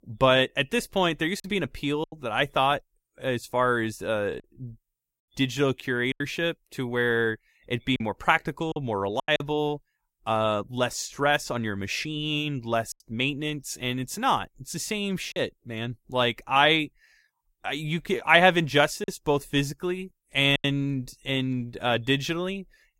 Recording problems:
choppy; occasionally; 4% of the speech affected

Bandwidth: 16 kHz